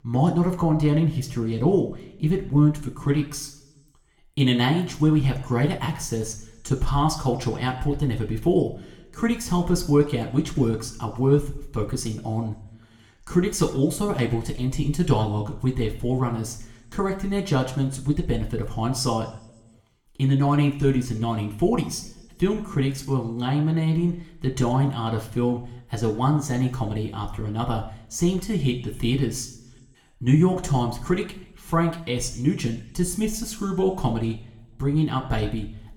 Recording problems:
room echo; slight; dies away in 0.6 s
off-mic speech; somewhat distant

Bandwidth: 18 kHz